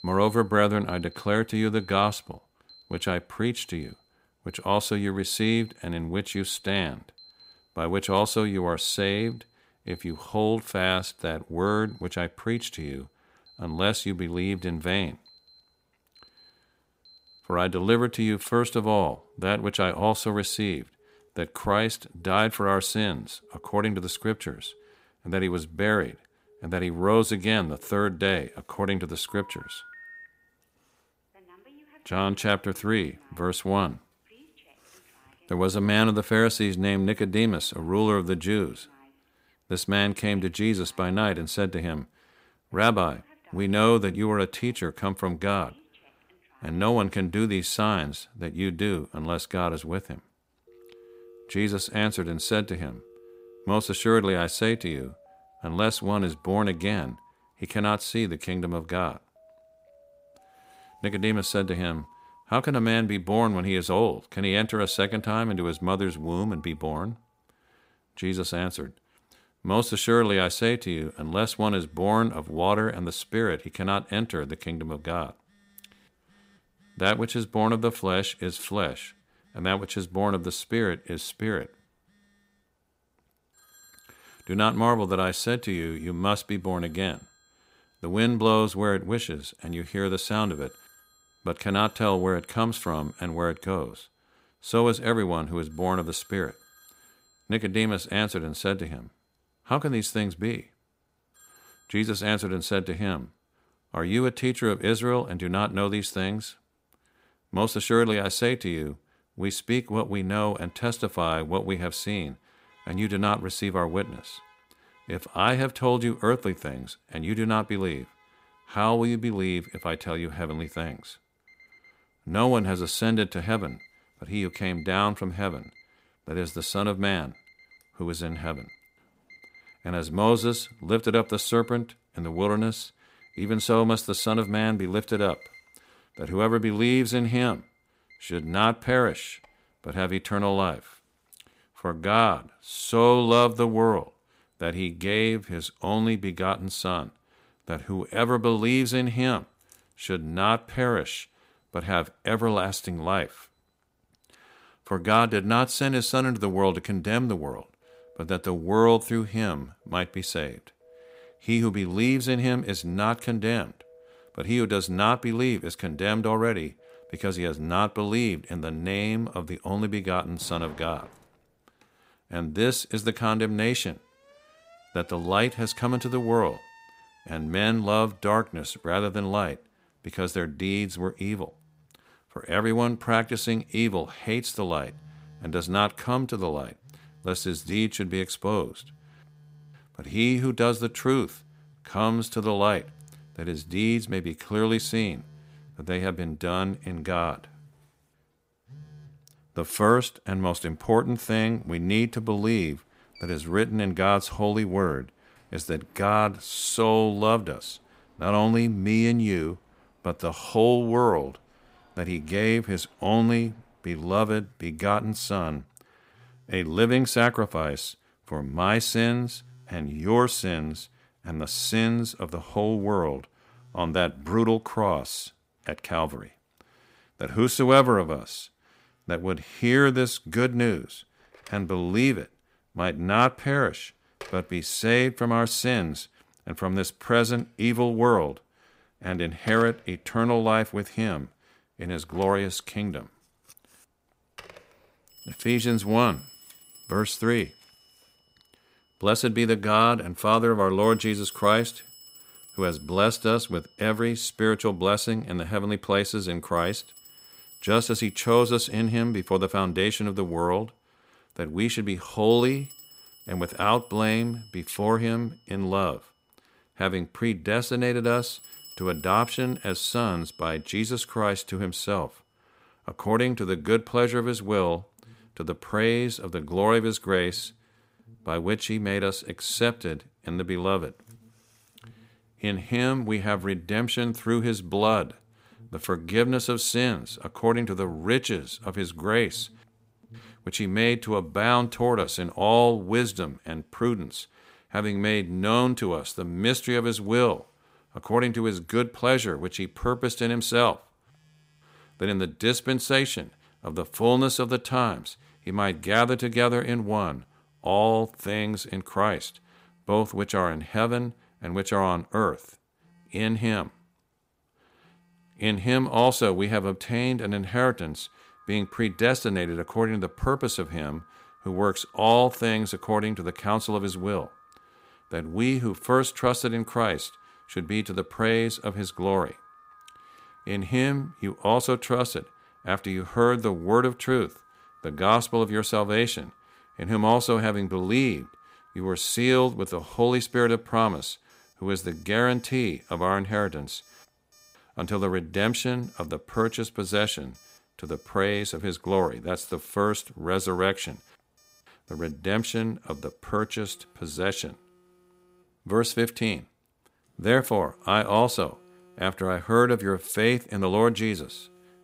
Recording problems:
alarms or sirens; faint; throughout; 25 dB below the speech

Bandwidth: 15.5 kHz